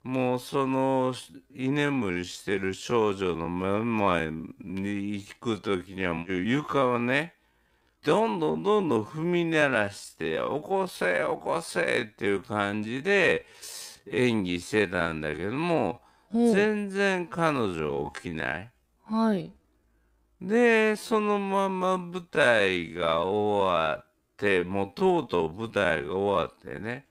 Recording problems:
wrong speed, natural pitch; too slow; 0.5 times normal speed

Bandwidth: 15.5 kHz